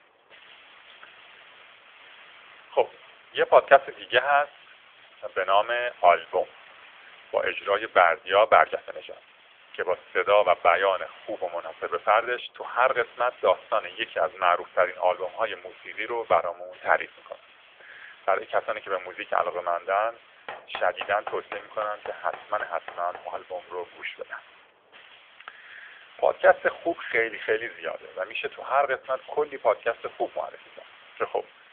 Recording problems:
thin; very; fading below 600 Hz
phone-call audio; nothing above 3.5 kHz
hiss; faint; throughout; 25 dB below the speech
door banging; faint; from 20 to 23 s; peak 15 dB below the speech

